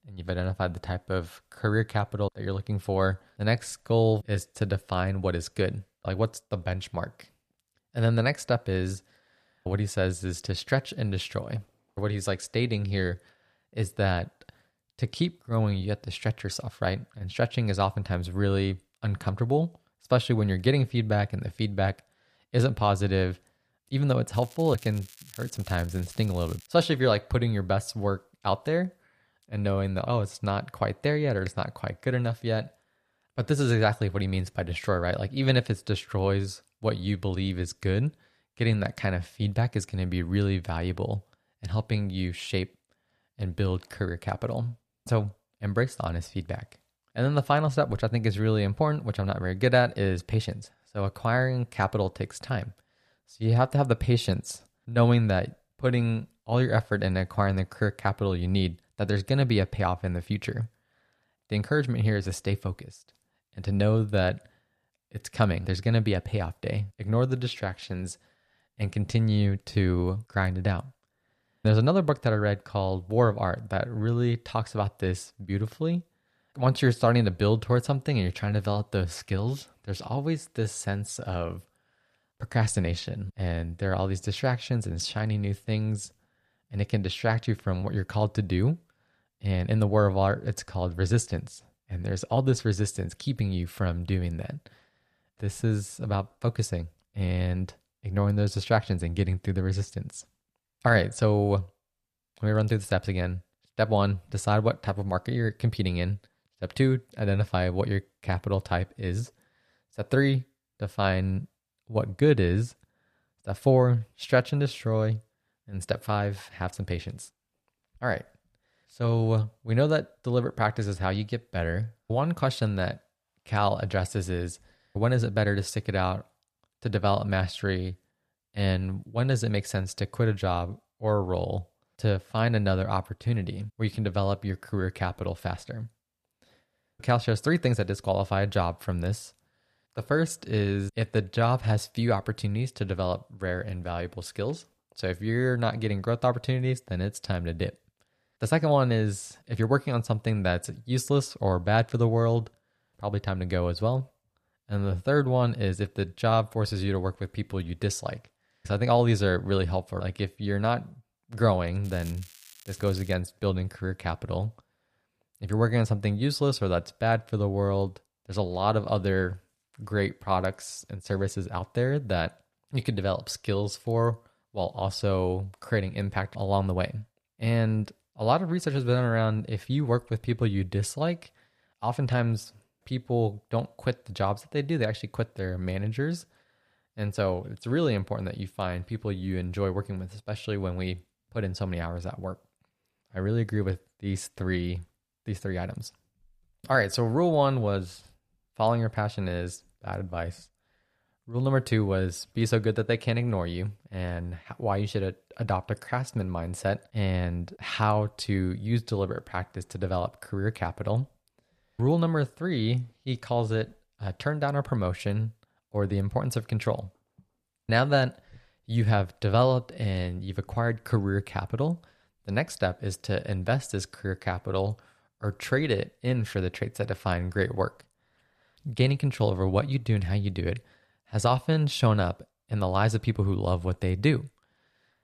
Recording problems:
crackling; faint; from 24 to 27 s and from 2:42 to 2:43; 20 dB below the speech

